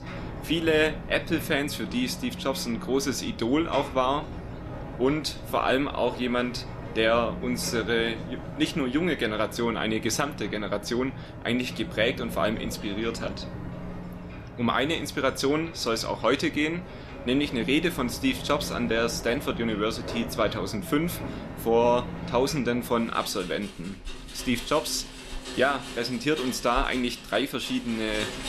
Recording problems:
rain or running water; noticeable; throughout; 10 dB below the speech

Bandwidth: 13.5 kHz